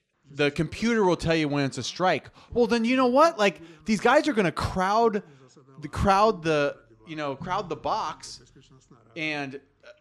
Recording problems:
voice in the background; faint; throughout; 30 dB below the speech

